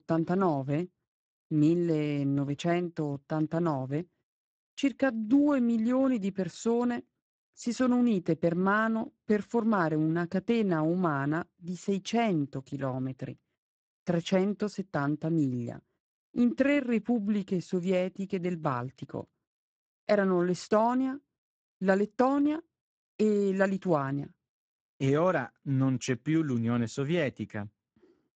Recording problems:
garbled, watery; badly; nothing above 7.5 kHz

